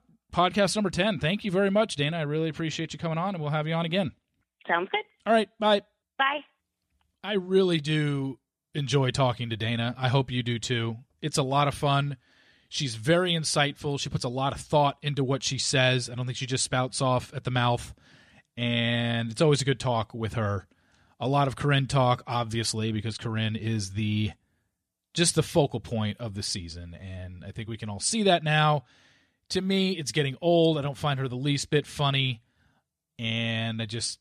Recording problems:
none

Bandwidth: 14 kHz